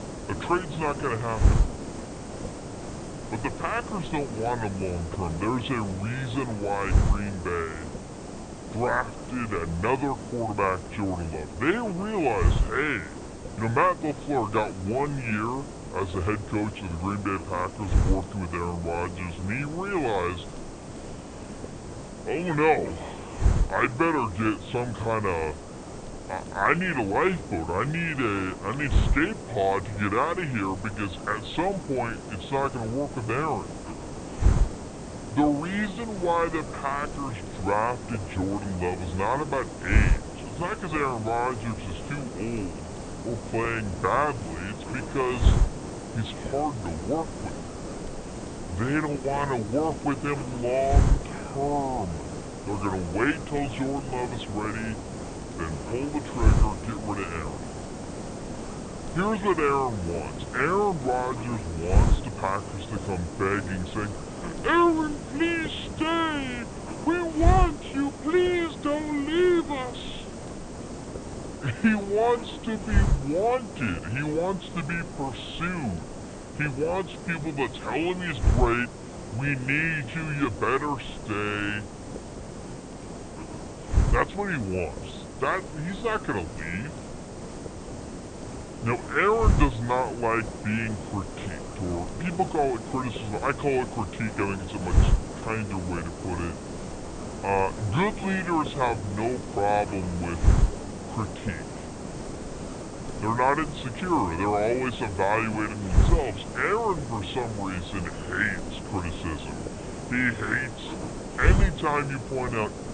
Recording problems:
high frequencies cut off; severe; nothing above 4 kHz
wrong speed and pitch; too slow and too low; 0.7 times normal speed
hiss; loud; throughout; 5 dB below the speech

